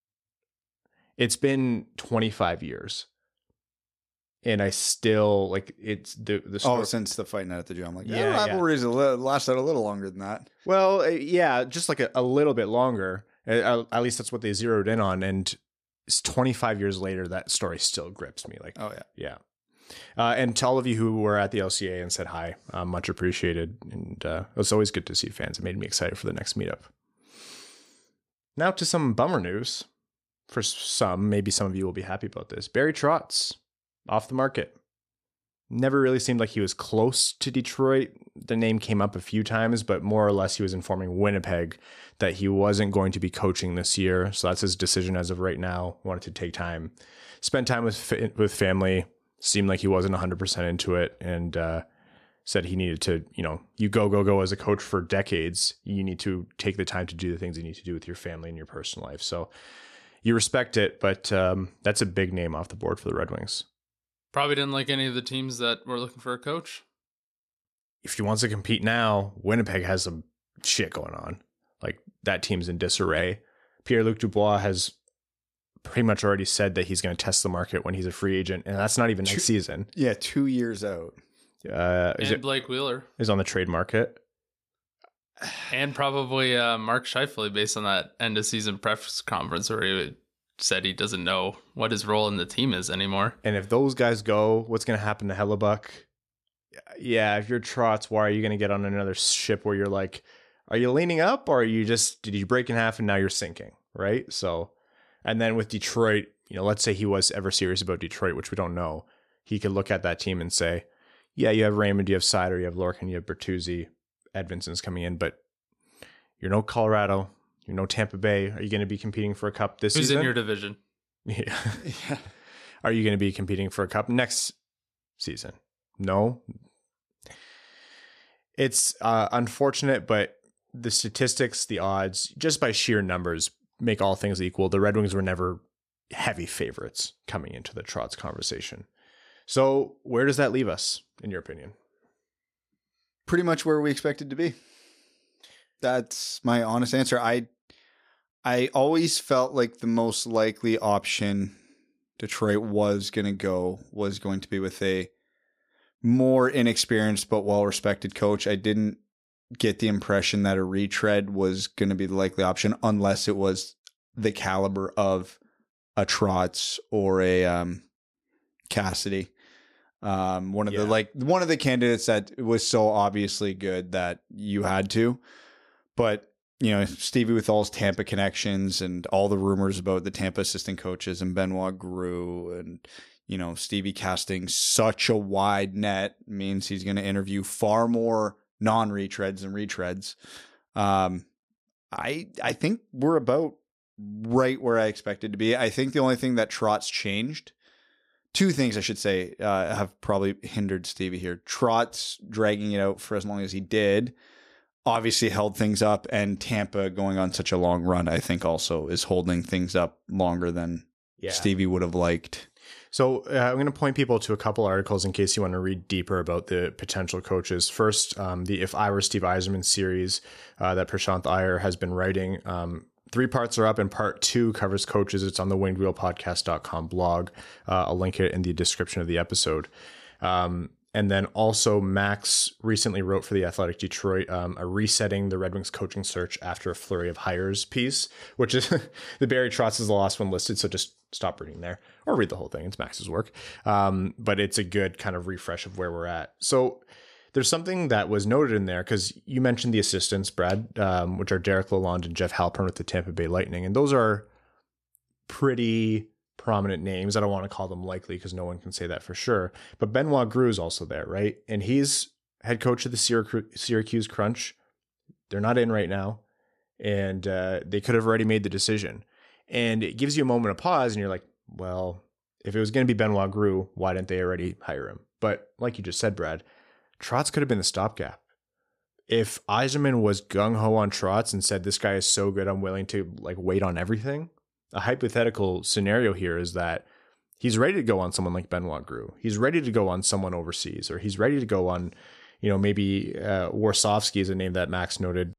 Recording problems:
none

